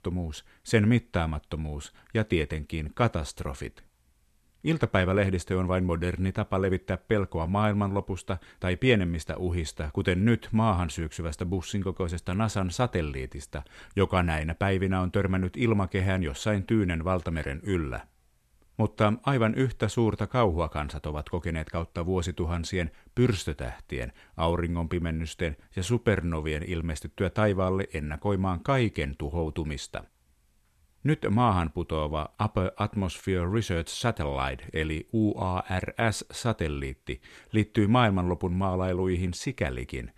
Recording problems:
none

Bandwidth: 13.5 kHz